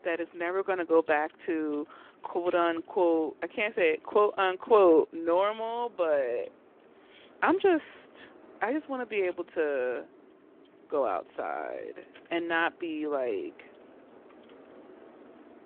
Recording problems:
phone-call audio
traffic noise; faint; throughout; 25 dB below the speech

